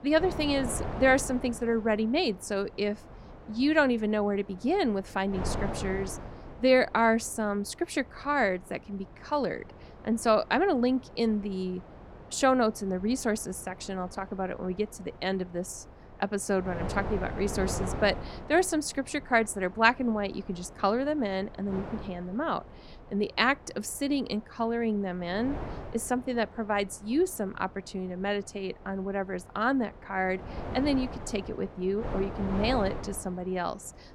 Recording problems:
wind noise on the microphone; occasional gusts; 15 dB below the speech

